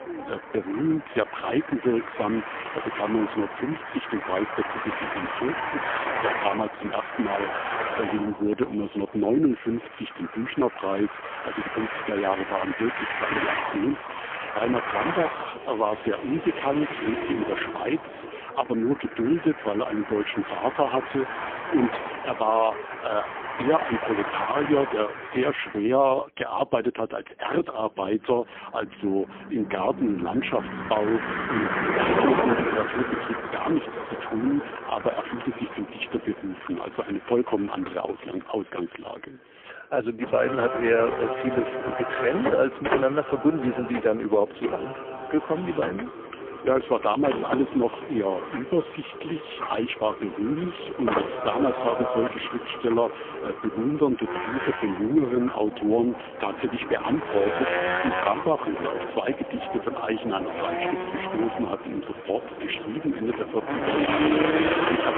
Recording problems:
phone-call audio; poor line; nothing above 3.5 kHz
traffic noise; loud; throughout; 4 dB below the speech

